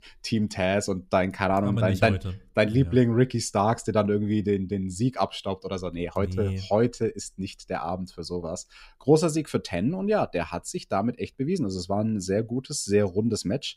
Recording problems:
none

